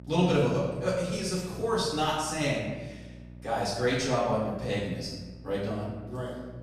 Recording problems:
off-mic speech; far
room echo; noticeable; dies away in 1.1 s
electrical hum; faint; throughout; 60 Hz, 25 dB below the speech

